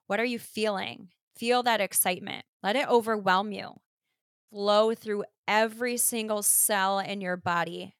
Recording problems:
none

